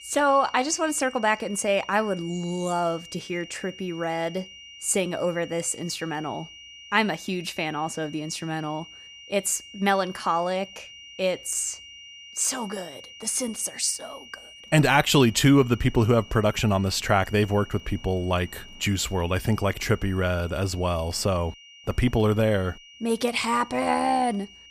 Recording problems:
high-pitched whine; noticeable; throughout; 3 kHz, 20 dB below the speech

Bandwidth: 15 kHz